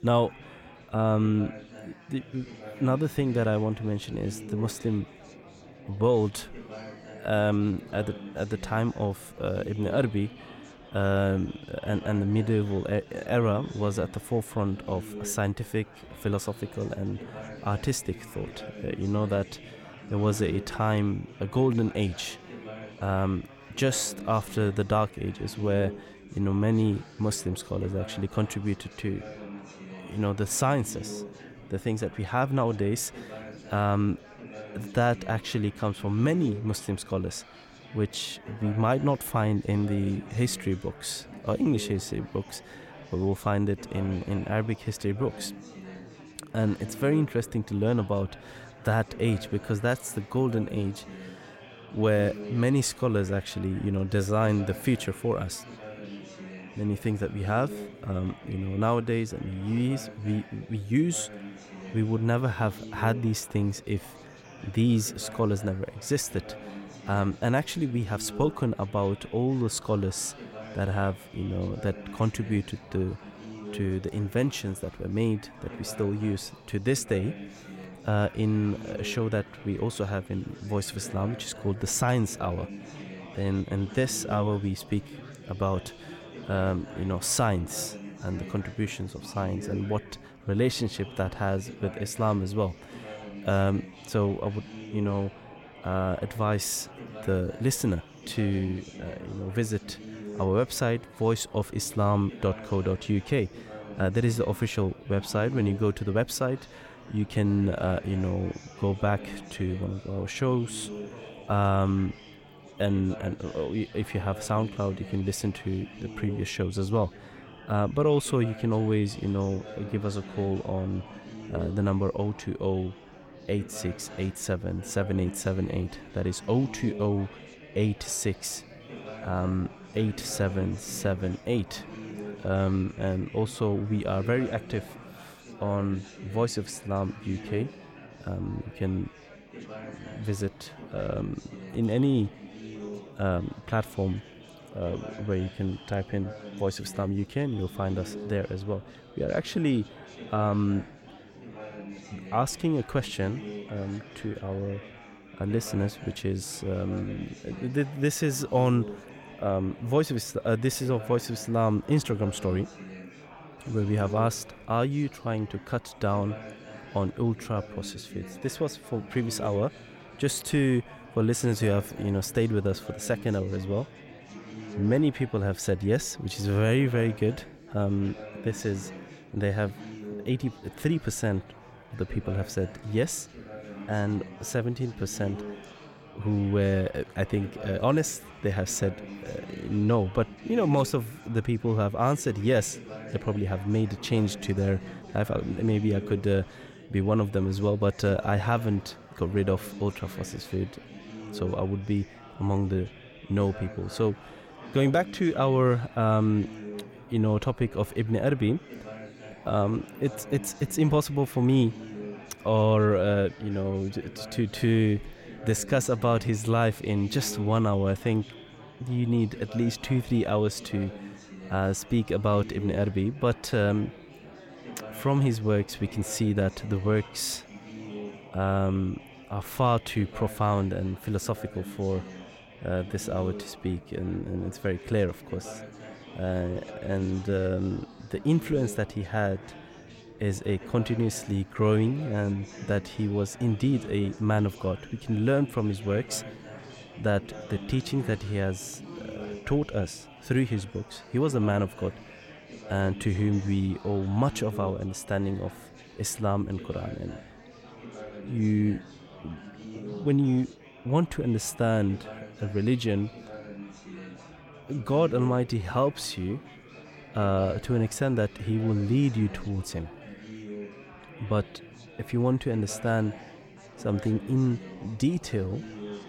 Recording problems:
chatter from many people; noticeable; throughout; 15 dB below the speech

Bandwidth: 16.5 kHz